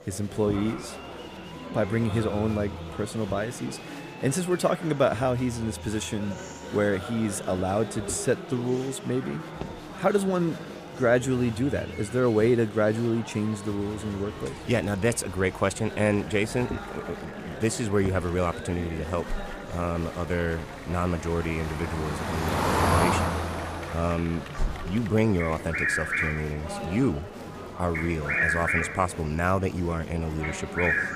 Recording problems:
traffic noise; loud; throughout; 6 dB below the speech
animal sounds; loud; from 14 s on; 3 dB below the speech
murmuring crowd; noticeable; throughout; 10 dB below the speech

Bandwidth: 15 kHz